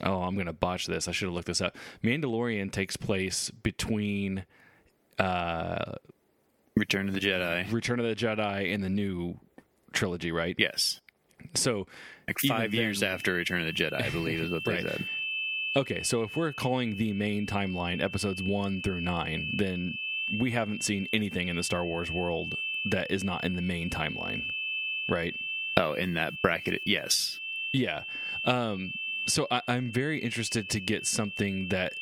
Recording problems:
squashed, flat; somewhat
high-pitched whine; loud; from 13 s on; 2.5 kHz, 5 dB below the speech

